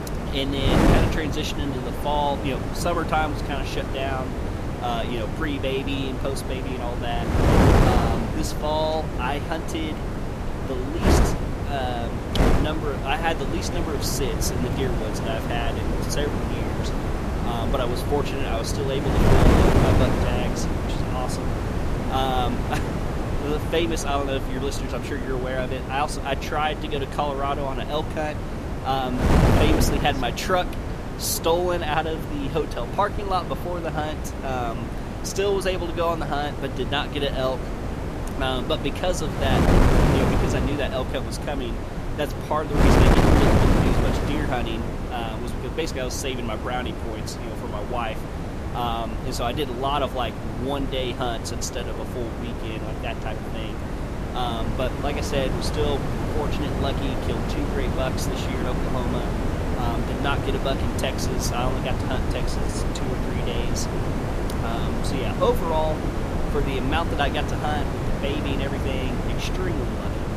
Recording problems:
wind noise on the microphone; heavy; 2 dB below the speech

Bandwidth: 14.5 kHz